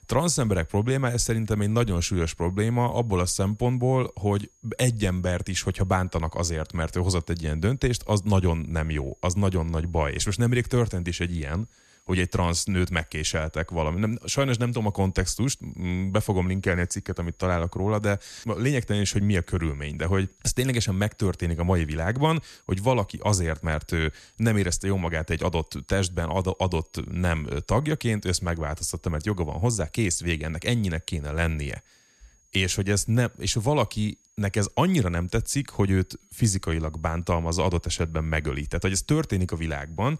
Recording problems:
high-pitched whine; faint; throughout; 6.5 kHz, 35 dB below the speech

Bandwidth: 13.5 kHz